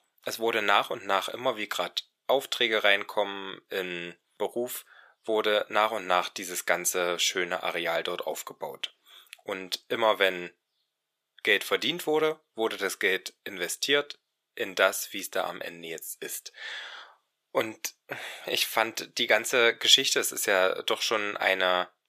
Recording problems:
thin; very; fading below 600 Hz

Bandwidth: 14.5 kHz